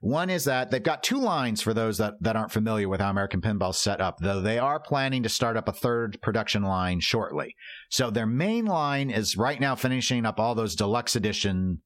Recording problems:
squashed, flat; heavily

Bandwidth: 16.5 kHz